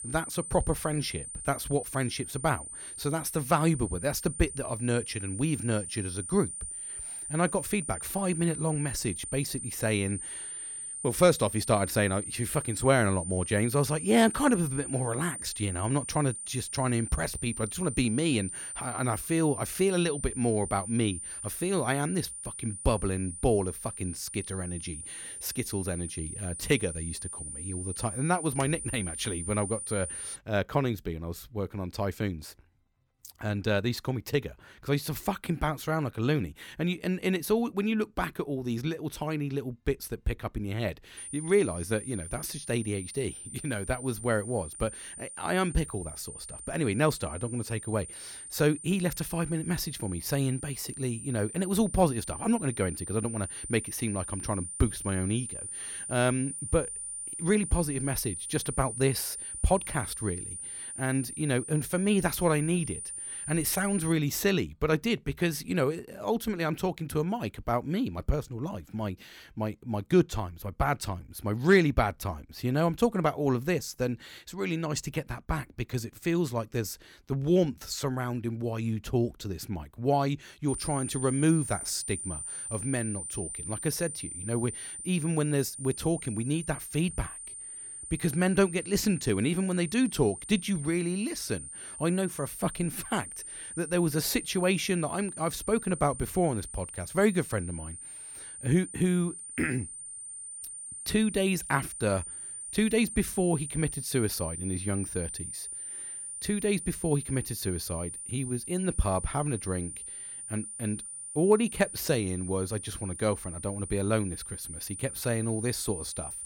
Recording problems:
high-pitched whine; loud; until 30 s, from 41 s to 1:04 and from 1:21 on; 9 kHz, 7 dB below the speech

